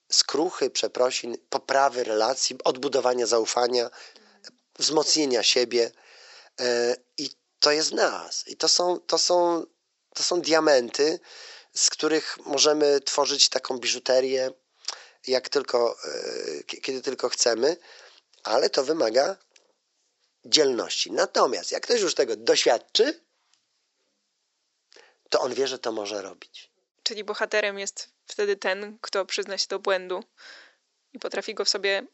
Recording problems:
thin; very; fading below 450 Hz
high frequencies cut off; noticeable; nothing above 7.5 kHz

